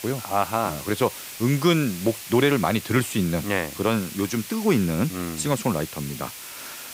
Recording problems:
hiss; noticeable; throughout; 10 dB below the speech

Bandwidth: 15.5 kHz